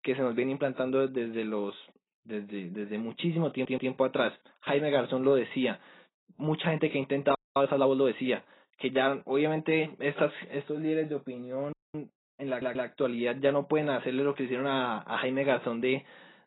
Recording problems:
garbled, watery; badly; nothing above 4 kHz
audio stuttering; at 3.5 s and at 12 s
audio freezing; at 7.5 s and at 12 s

